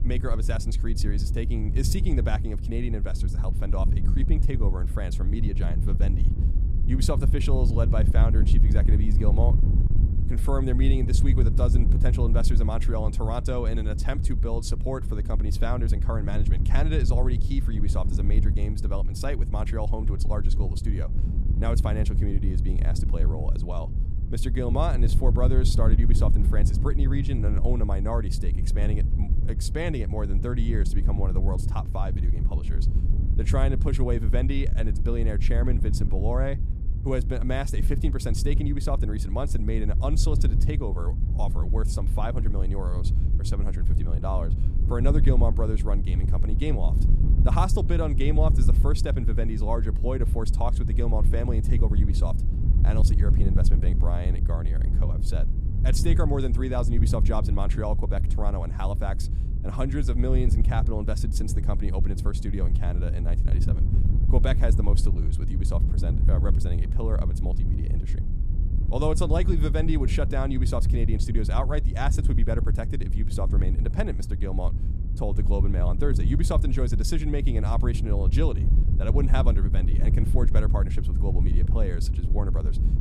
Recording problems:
wind noise on the microphone; heavy; 7 dB below the speech

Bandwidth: 14.5 kHz